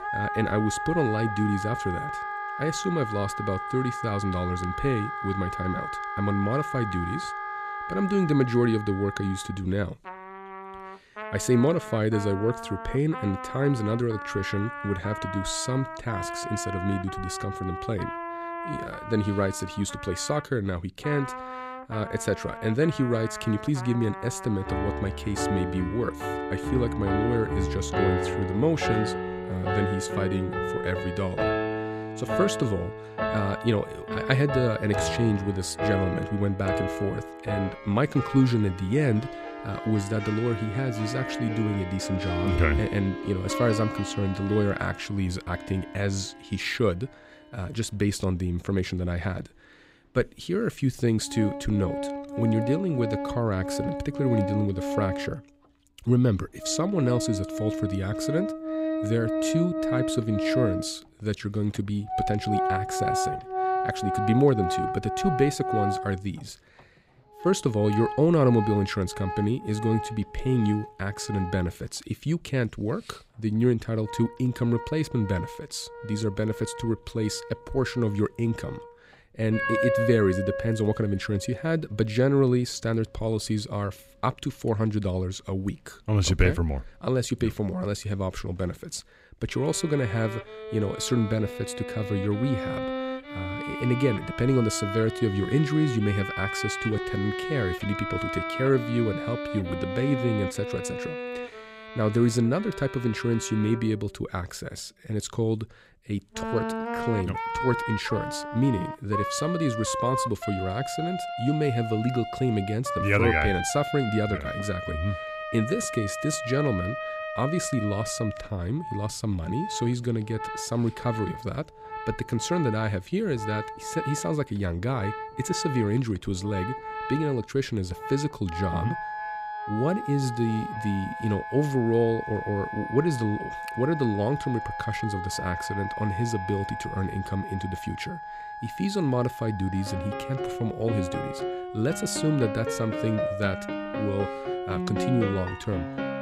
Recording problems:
background music; loud; throughout; 5 dB below the speech

